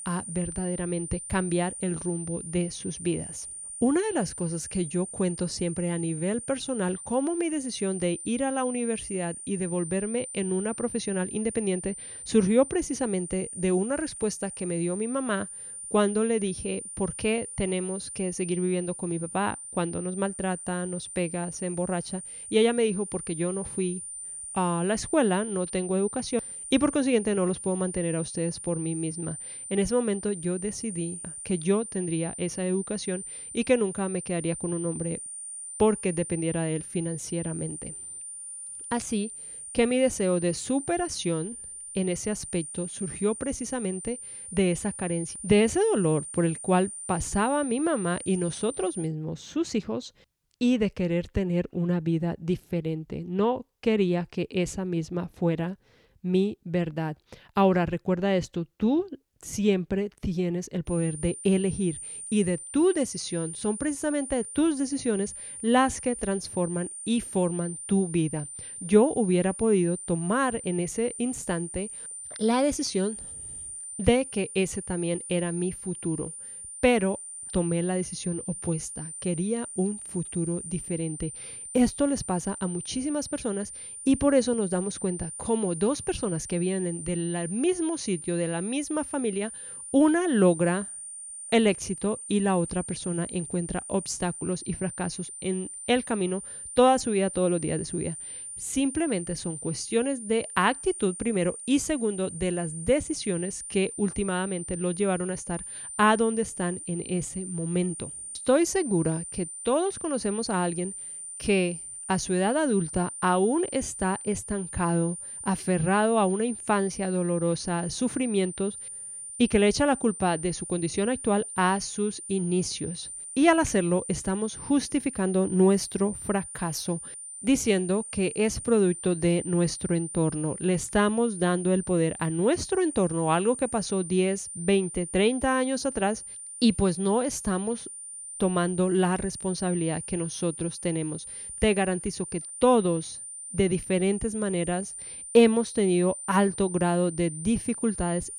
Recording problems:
high-pitched whine; loud; until 49 s and from 1:01 on; 9 kHz, 9 dB below the speech

